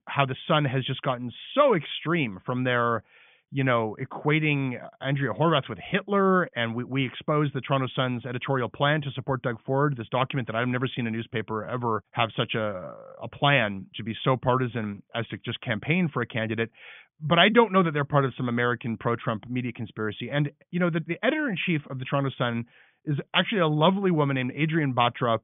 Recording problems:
high frequencies cut off; severe; nothing above 3.5 kHz

